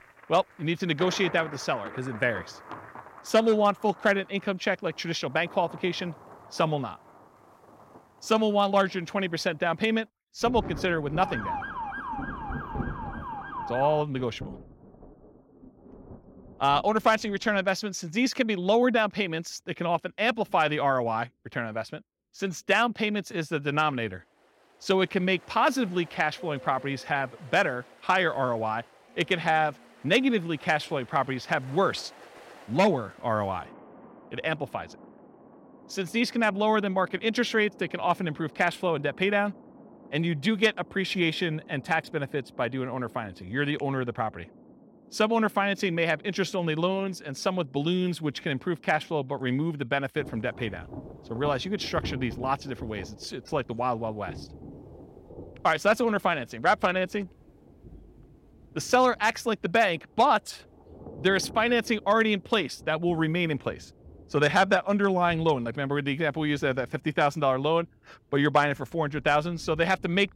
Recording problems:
rain or running water; noticeable; throughout; 20 dB below the speech
siren; noticeable; from 11 to 14 s; peak 6 dB below the speech

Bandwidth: 16.5 kHz